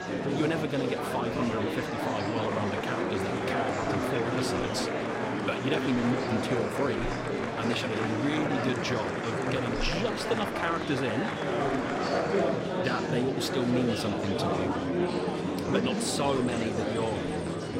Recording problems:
murmuring crowd; very loud; throughout; 2 dB above the speech

